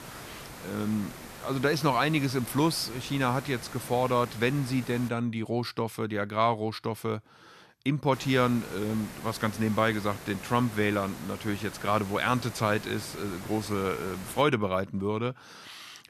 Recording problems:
hiss; noticeable; until 5 s and from 8 to 14 s; 15 dB below the speech

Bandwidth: 14 kHz